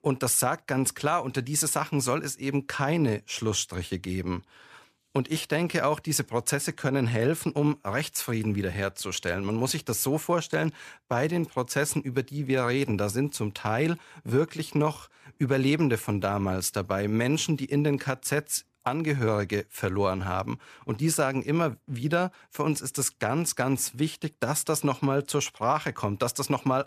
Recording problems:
none

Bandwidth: 14.5 kHz